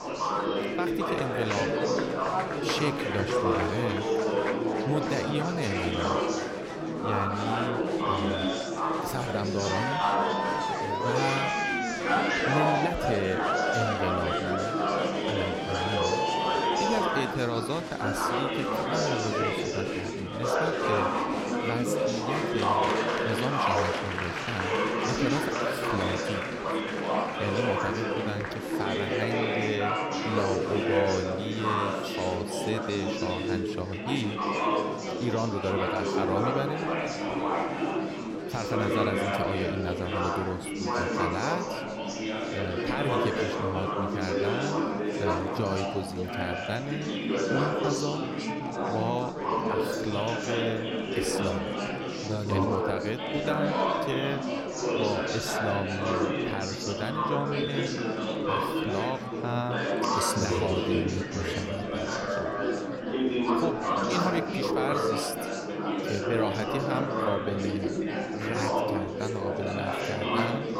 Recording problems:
chatter from many people; very loud; throughout; 5 dB above the speech

